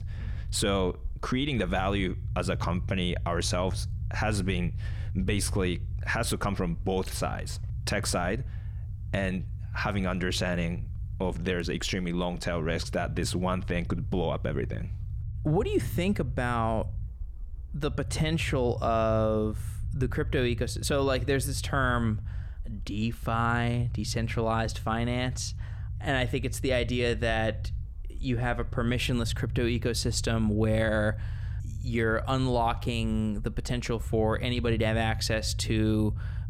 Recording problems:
low rumble; faint; throughout; 20 dB below the speech

